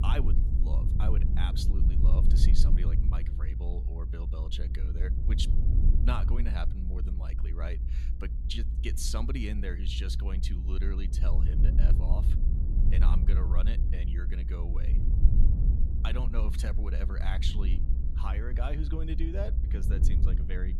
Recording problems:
low rumble; loud; throughout; 5 dB below the speech

